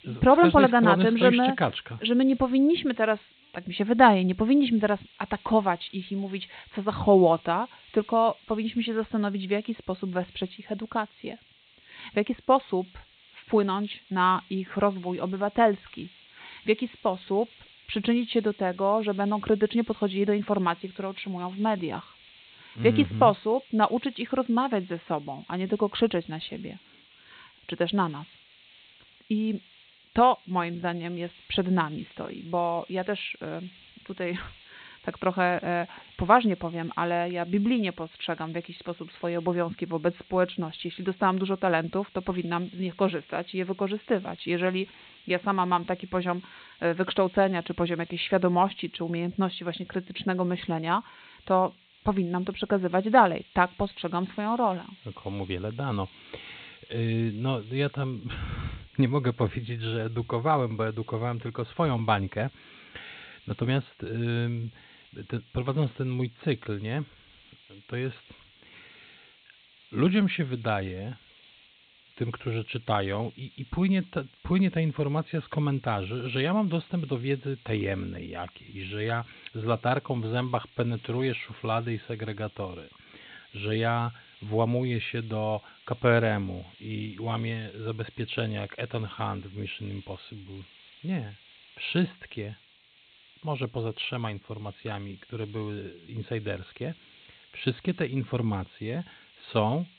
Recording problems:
high frequencies cut off; severe; nothing above 4 kHz
hiss; faint; throughout; 25 dB below the speech

